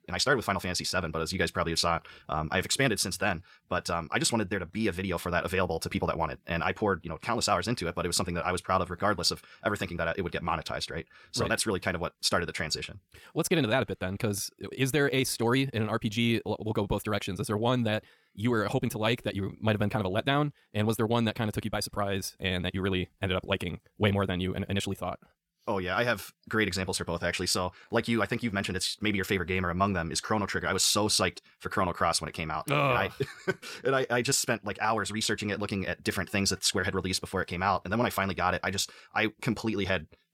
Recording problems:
wrong speed, natural pitch; too fast; 1.6 times normal speed

